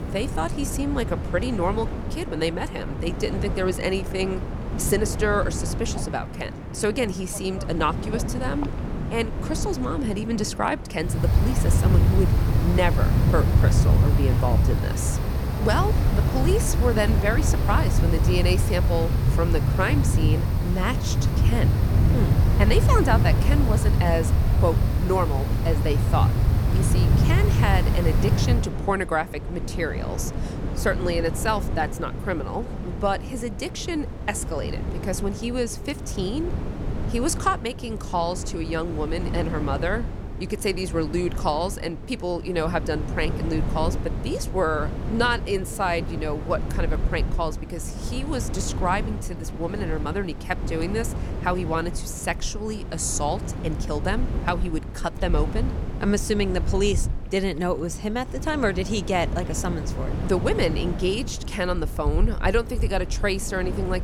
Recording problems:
wind in the background; very loud; throughout; 2 dB above the speech

